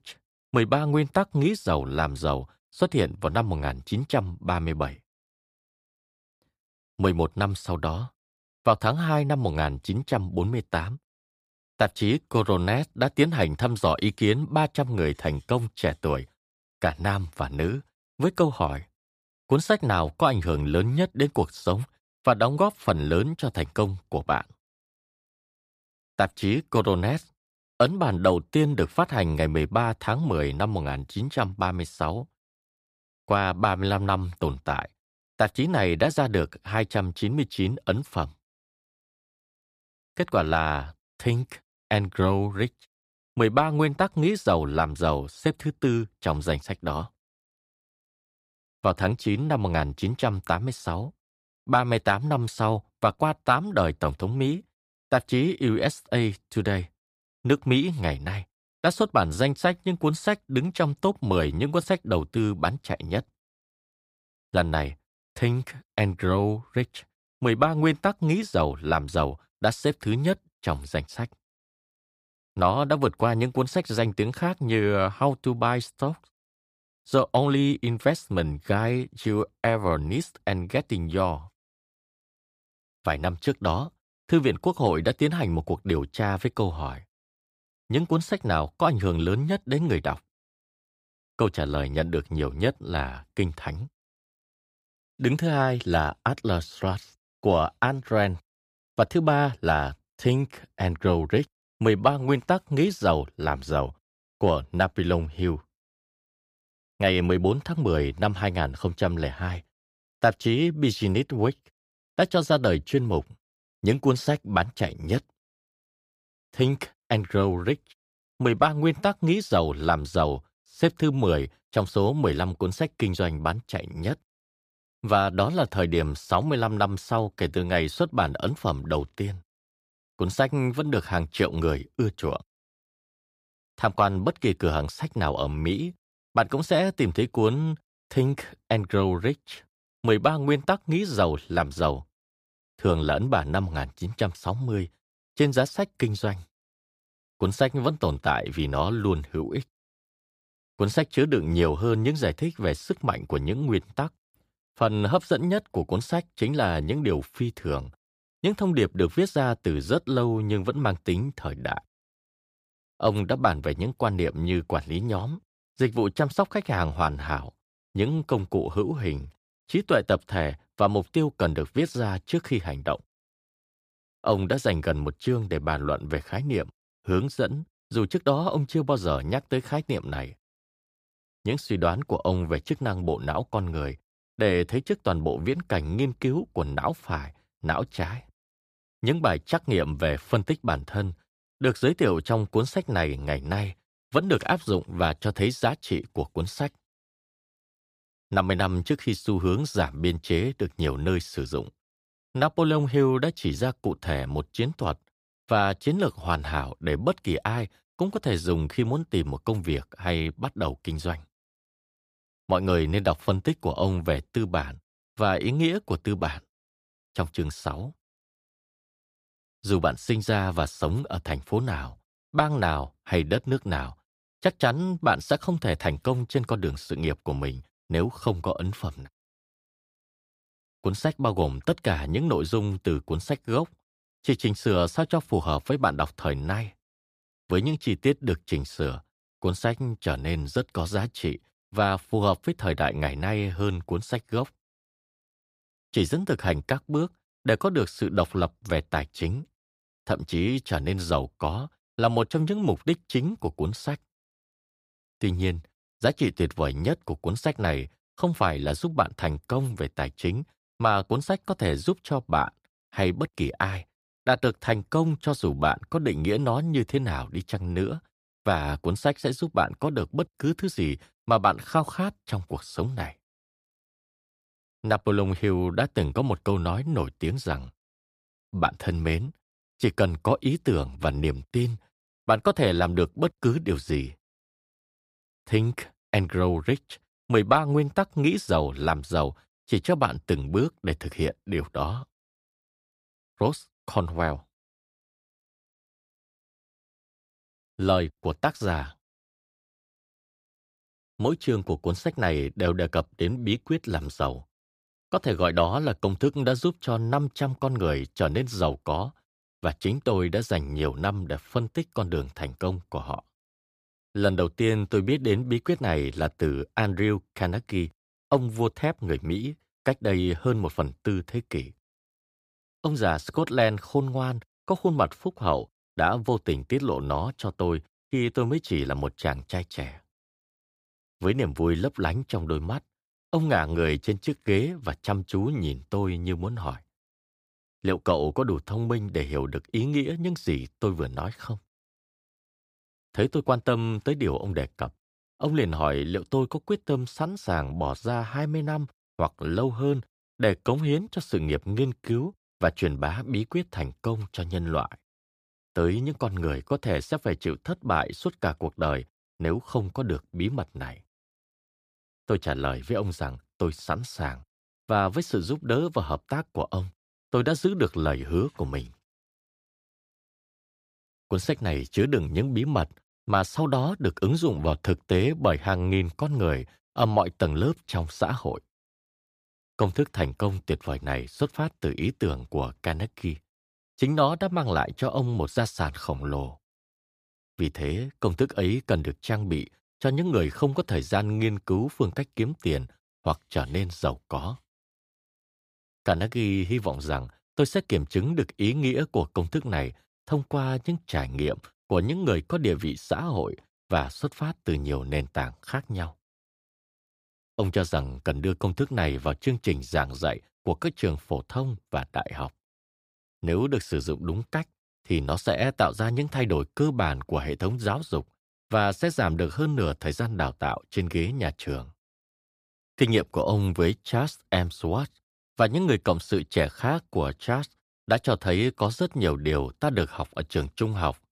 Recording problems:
none

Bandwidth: 15 kHz